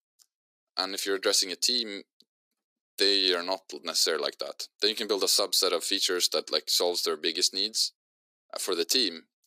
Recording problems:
thin; very; fading below 350 Hz

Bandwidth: 15.5 kHz